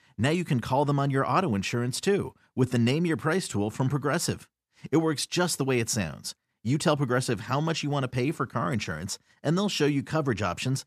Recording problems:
none

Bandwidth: 14.5 kHz